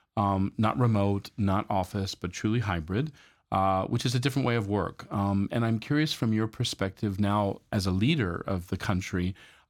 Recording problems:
none

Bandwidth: 18 kHz